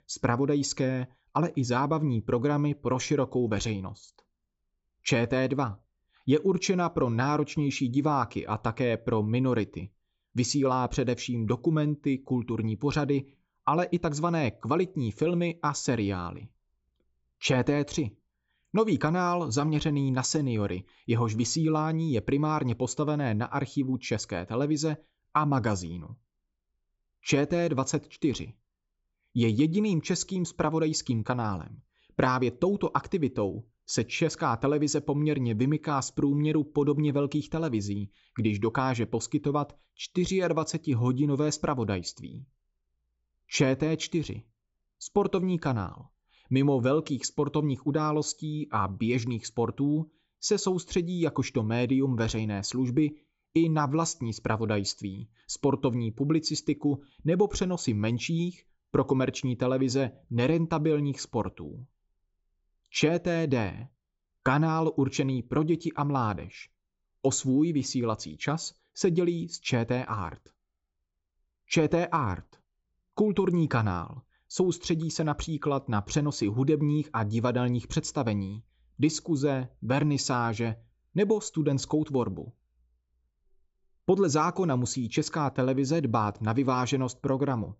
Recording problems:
high frequencies cut off; noticeable; nothing above 7.5 kHz

